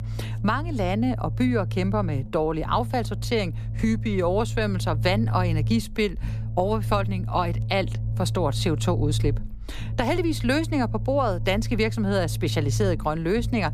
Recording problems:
low rumble; noticeable; throughout; 15 dB below the speech

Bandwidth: 14.5 kHz